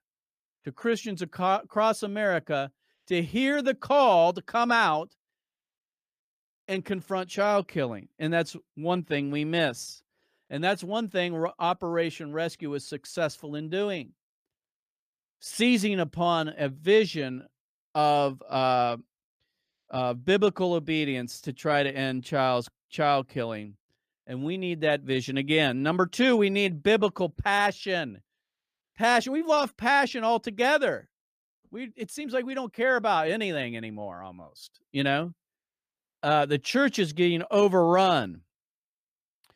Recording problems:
none

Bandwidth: 15 kHz